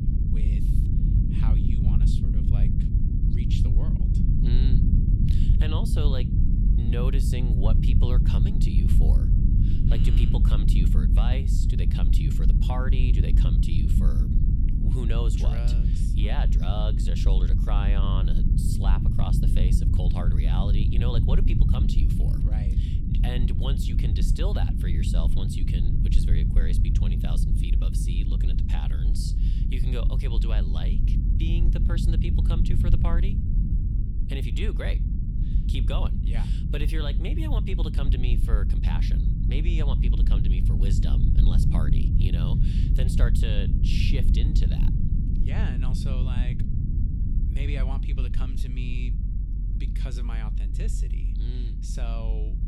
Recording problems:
low rumble; loud; throughout; as loud as the speech

